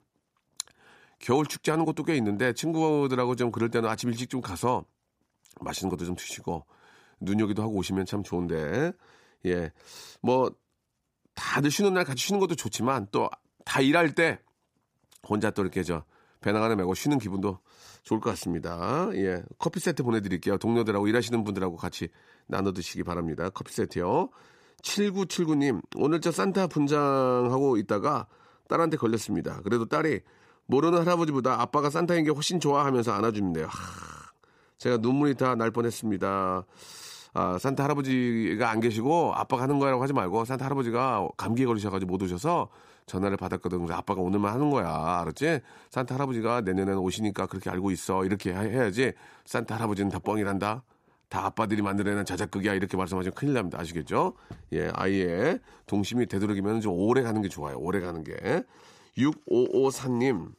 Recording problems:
none

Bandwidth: 15 kHz